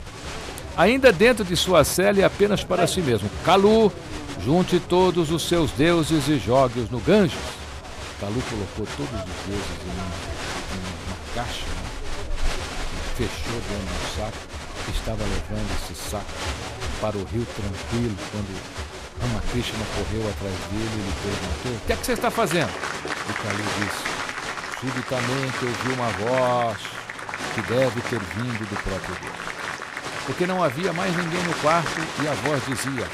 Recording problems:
crowd noise; loud; throughout; 7 dB below the speech

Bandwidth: 14.5 kHz